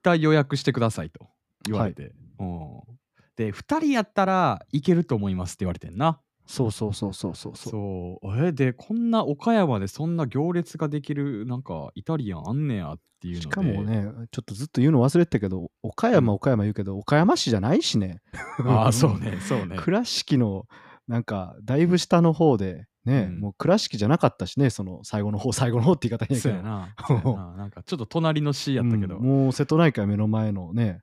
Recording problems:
none

